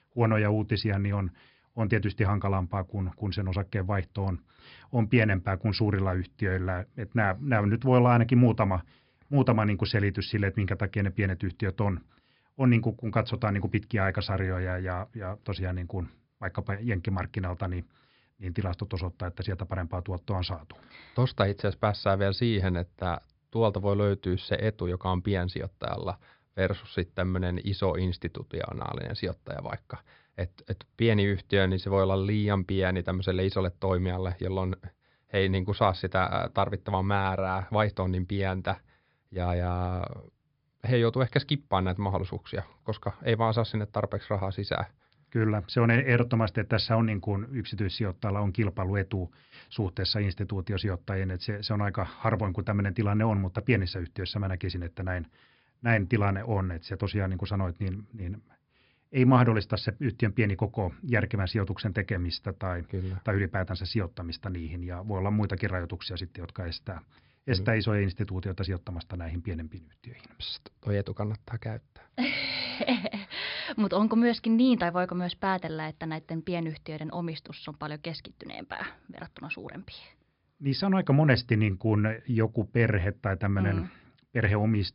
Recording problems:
high frequencies cut off; noticeable; nothing above 5.5 kHz

